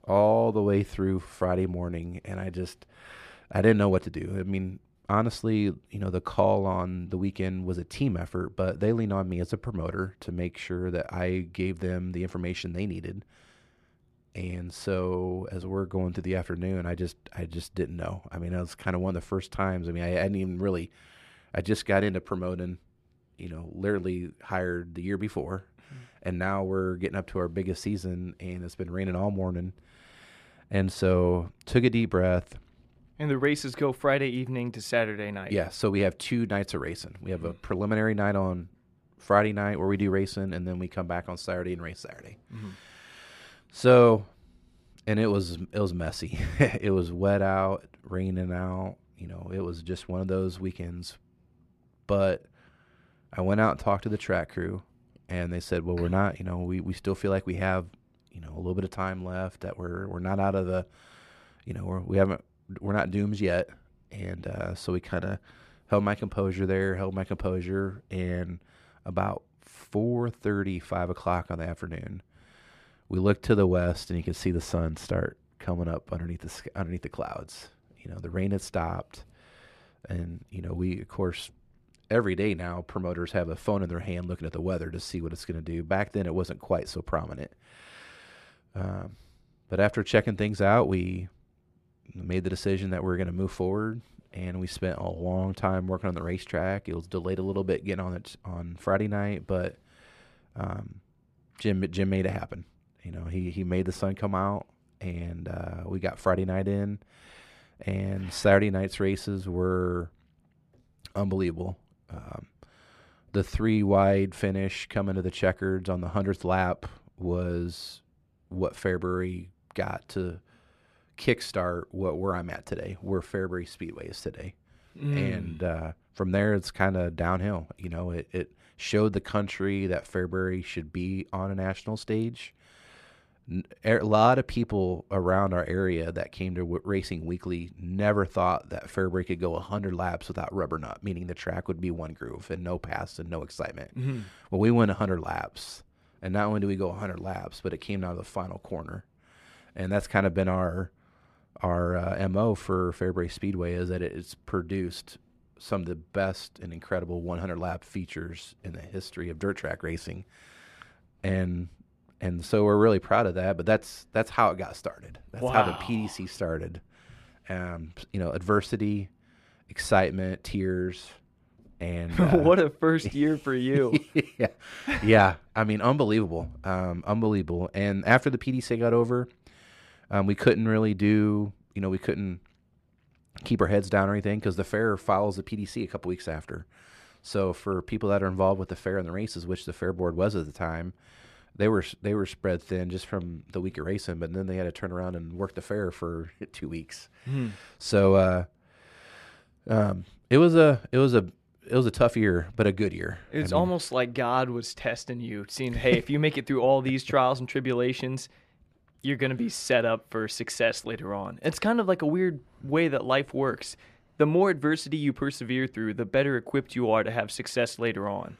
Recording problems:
muffled; slightly; fading above 3.5 kHz

